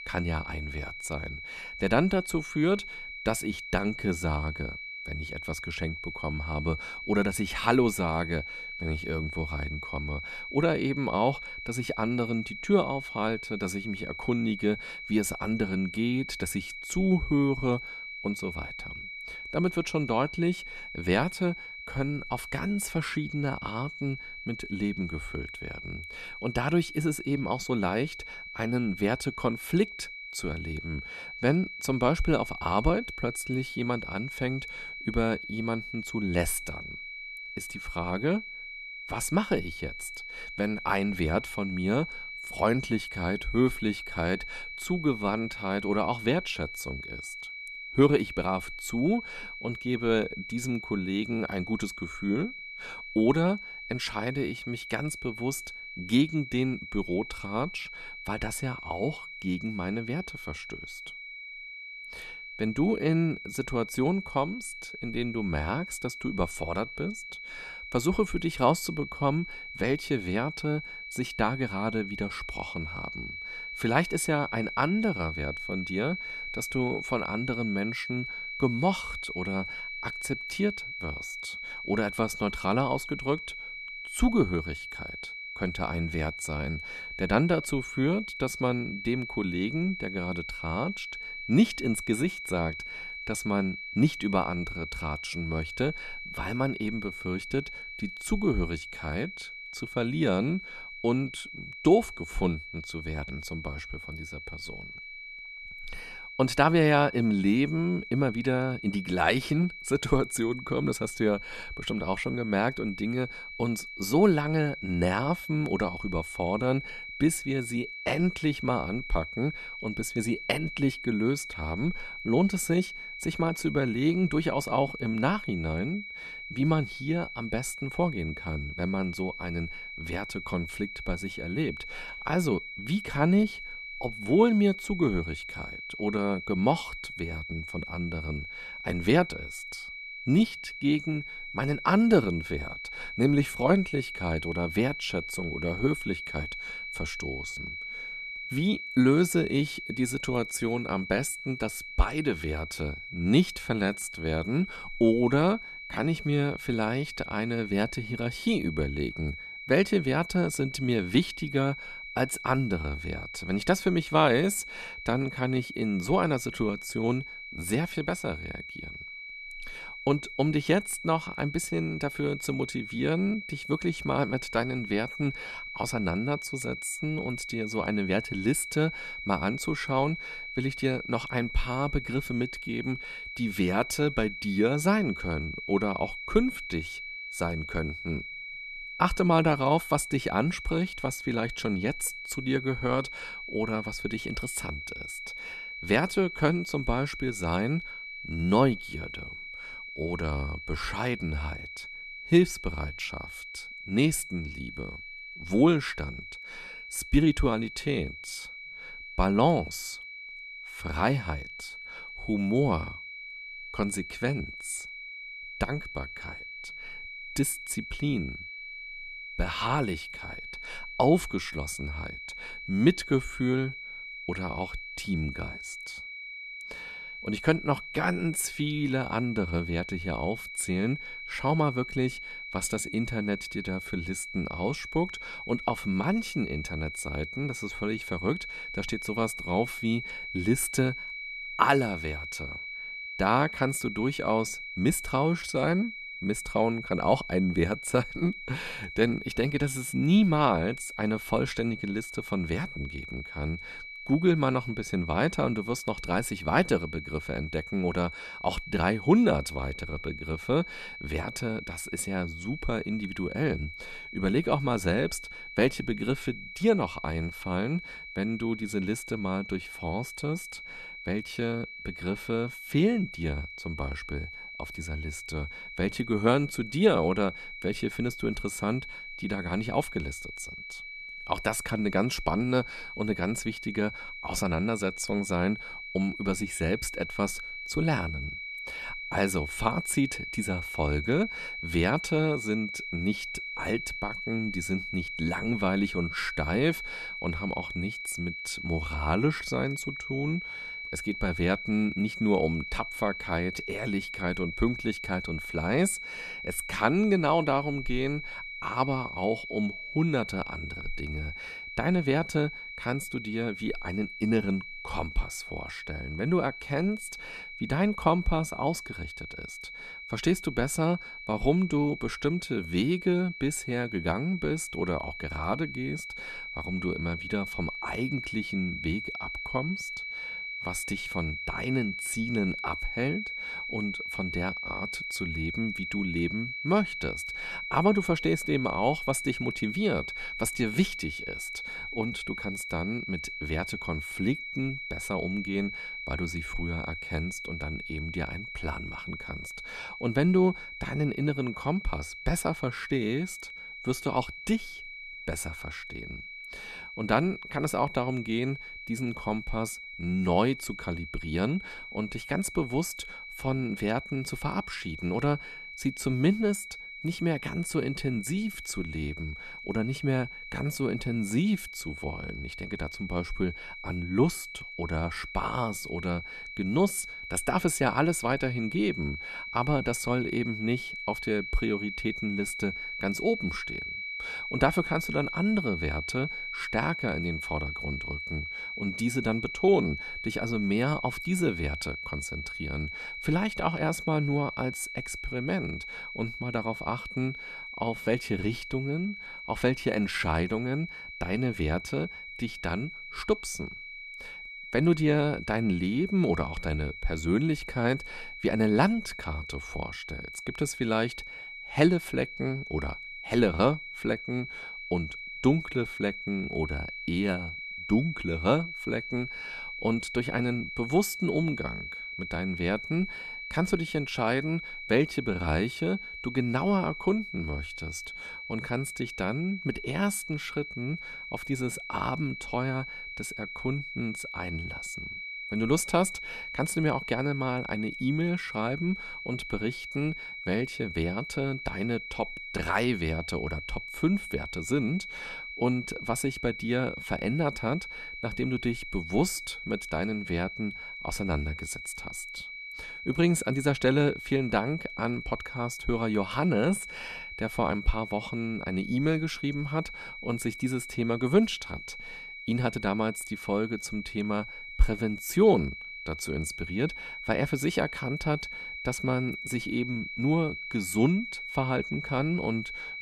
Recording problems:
high-pitched whine; loud; throughout; 2.5 kHz, 8 dB below the speech

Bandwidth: 13.5 kHz